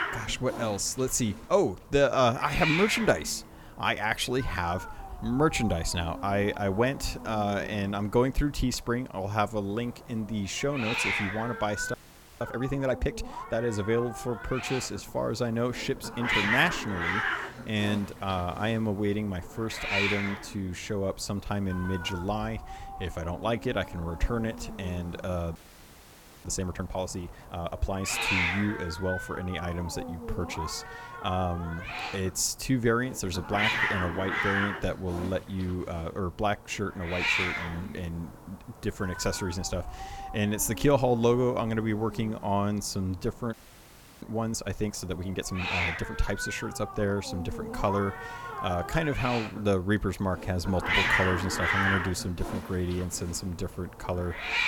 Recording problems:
hiss; loud; throughout; 3 dB below the speech
audio freezing; at 12 s, at 26 s for 1 s and at 44 s for 0.5 s

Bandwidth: 18.5 kHz